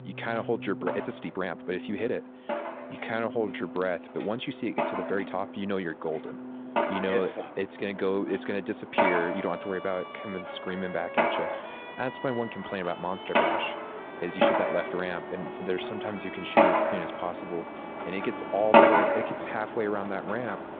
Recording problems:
phone-call audio; nothing above 3.5 kHz
machinery noise; very loud; throughout; 4 dB above the speech
background music; loud; throughout; 10 dB below the speech
household noises; faint; throughout; 20 dB below the speech
uneven, jittery; strongly; from 1 to 19 s

